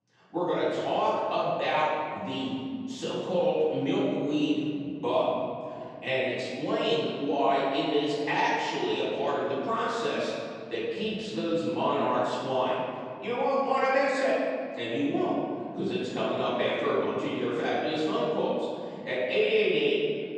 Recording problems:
room echo; strong; dies away in 2.6 s
off-mic speech; far

